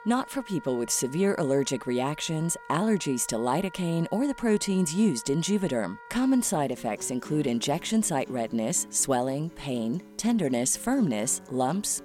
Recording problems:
background music; noticeable; throughout; 20 dB below the speech

